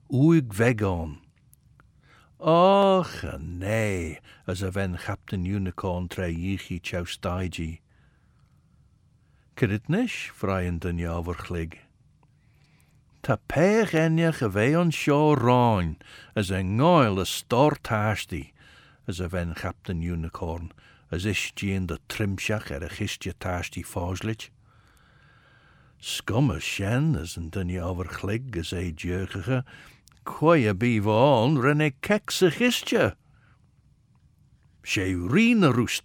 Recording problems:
none

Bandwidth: 17 kHz